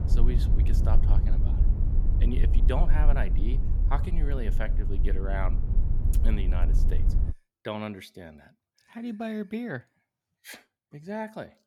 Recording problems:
low rumble; loud; until 7.5 s; 7 dB below the speech

